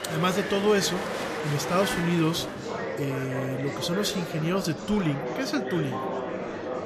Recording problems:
murmuring crowd; loud; throughout; 4 dB below the speech

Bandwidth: 14 kHz